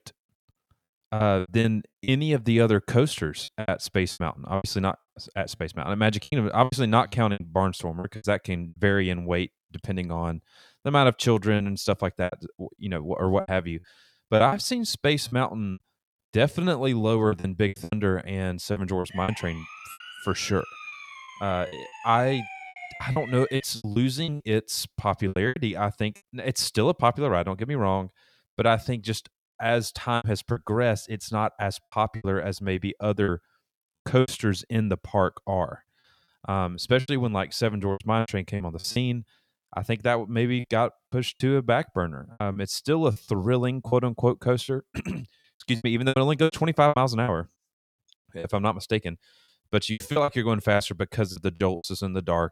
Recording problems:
choppy; very; 10% of the speech affected
siren; faint; from 19 to 24 s; peak 10 dB below the speech

